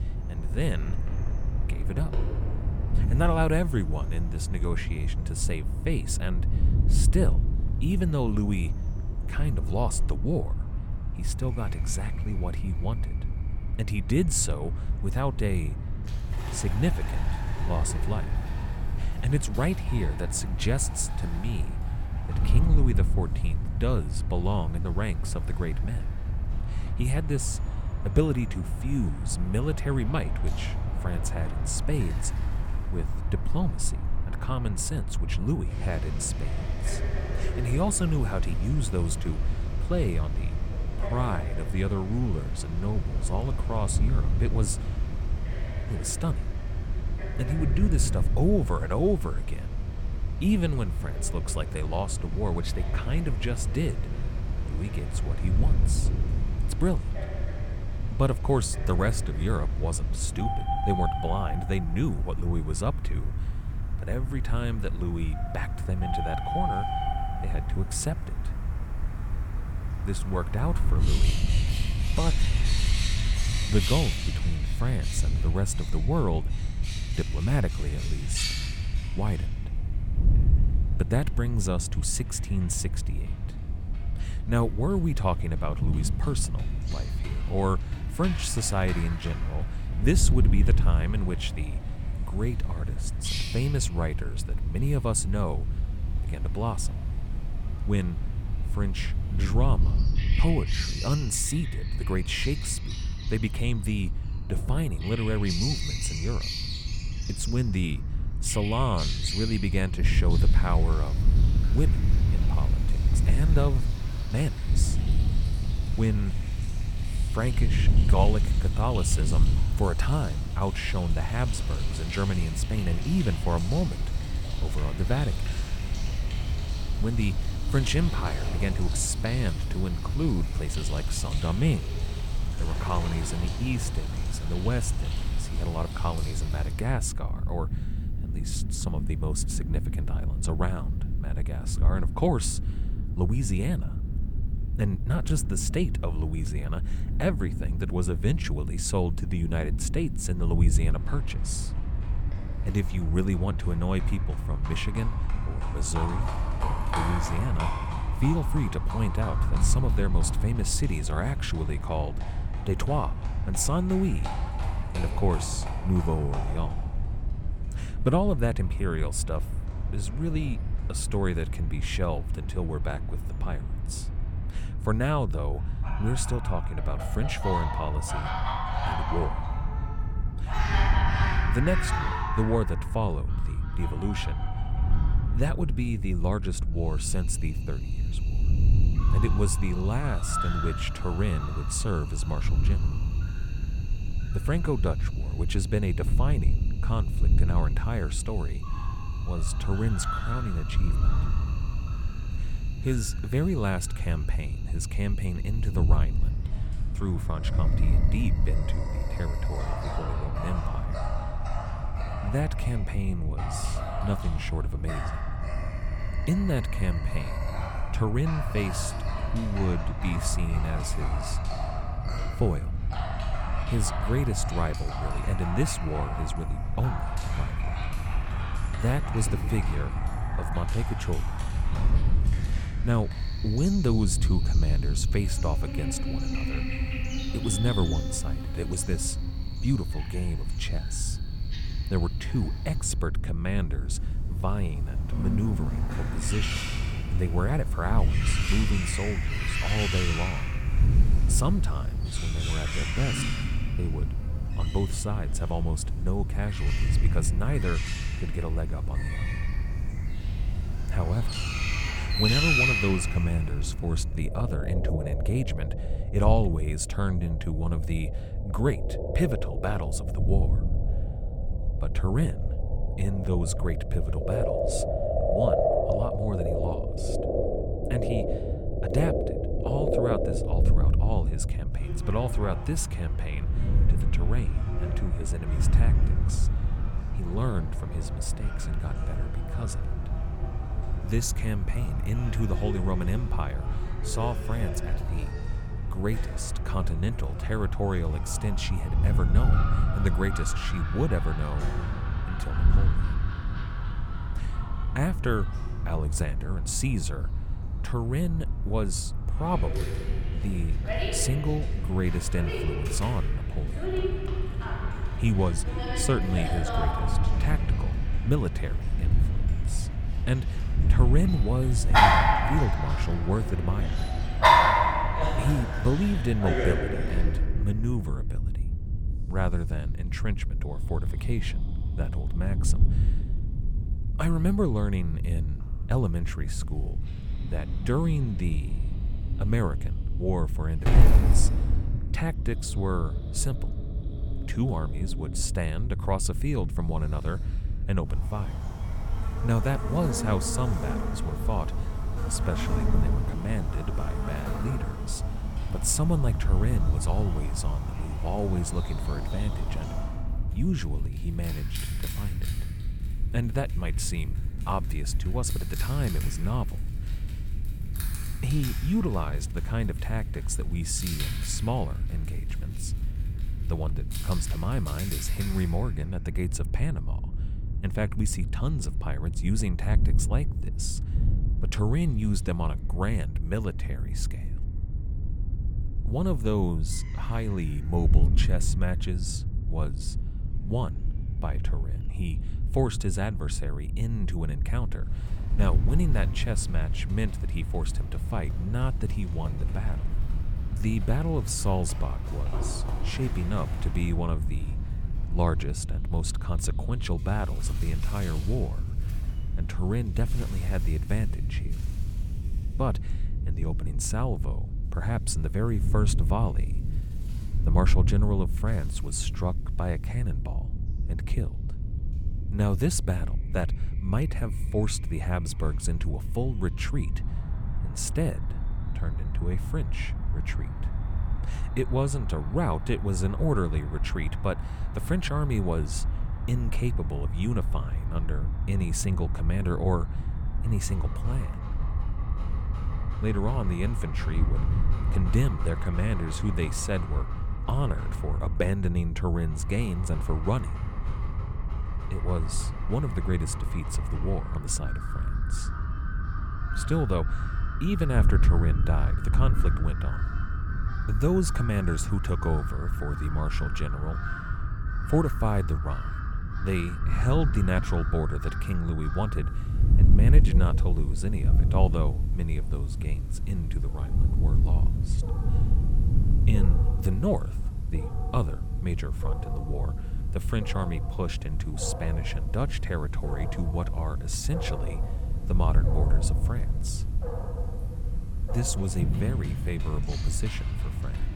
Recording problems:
animal sounds; loud; throughout; 6 dB below the speech
wind noise on the microphone; occasional gusts; 10 dB below the speech

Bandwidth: 18 kHz